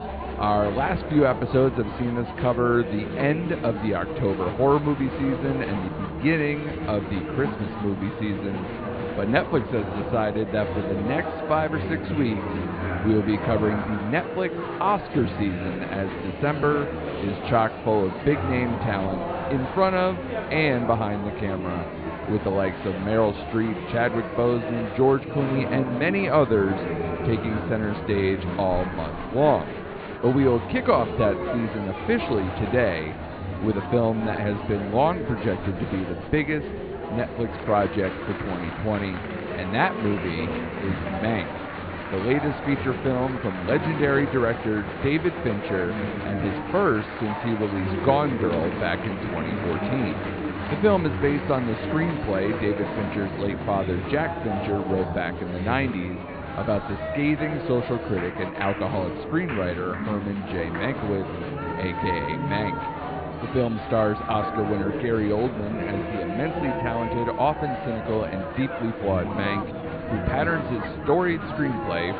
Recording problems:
high frequencies cut off; severe; nothing above 4.5 kHz
muffled; very slightly; fading above 2.5 kHz
murmuring crowd; loud; throughout; 5 dB below the speech

